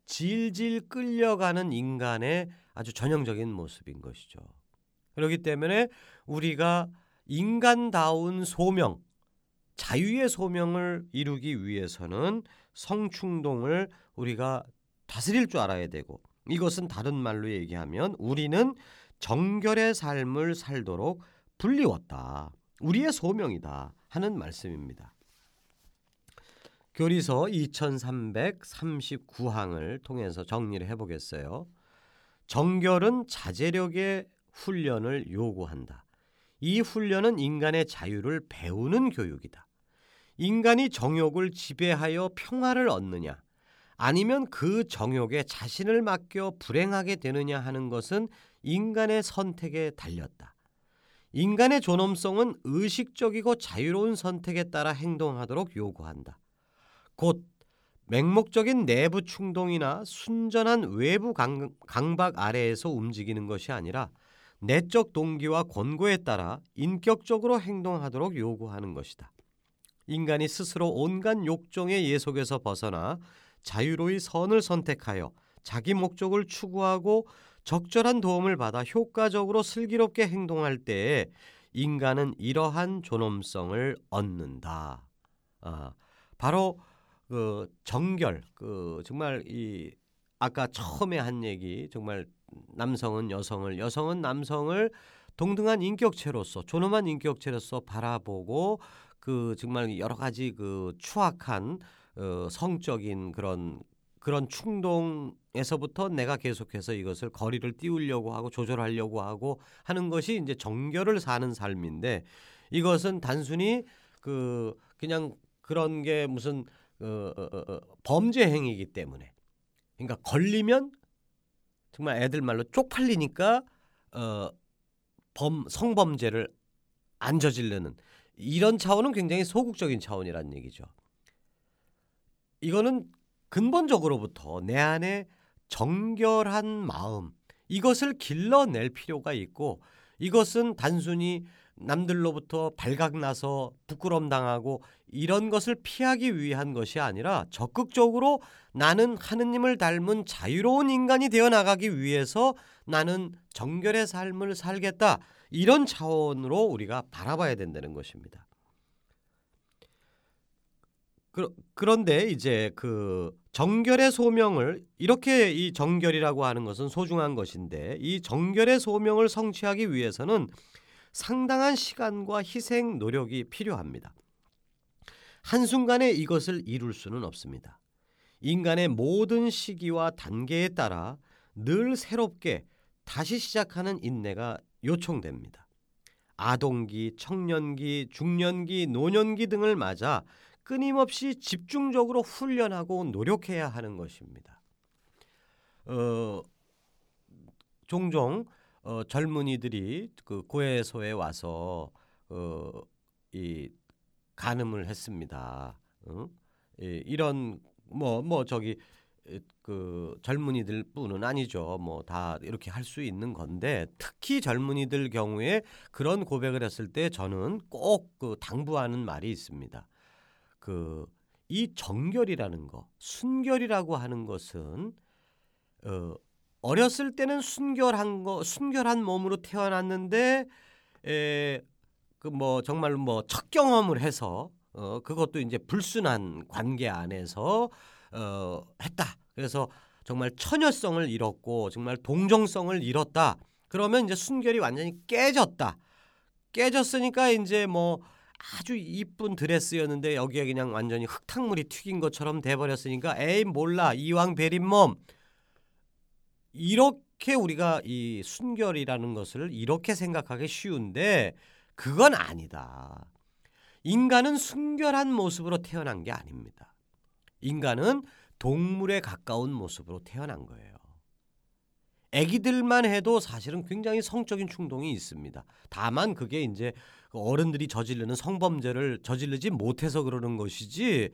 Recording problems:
audio stuttering; at 1:57

